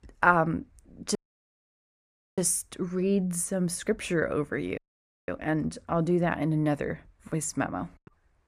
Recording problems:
audio cutting out; at 1 s for 1 s and at 5 s for 0.5 s

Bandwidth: 14.5 kHz